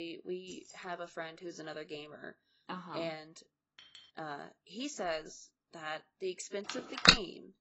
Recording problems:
garbled, watery; badly; nothing above 8 kHz
abrupt cut into speech; at the start
jangling keys; faint; at 0.5 s; peak 10 dB below the speech
clattering dishes; faint; at 4 s; peak 15 dB below the speech
phone ringing; loud; at 6.5 s; peak 15 dB above the speech

